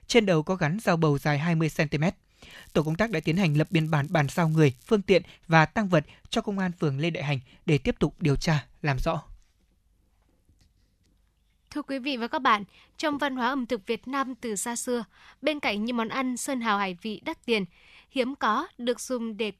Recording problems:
crackling; faint; from 2.5 to 5 s; 30 dB below the speech

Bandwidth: 13.5 kHz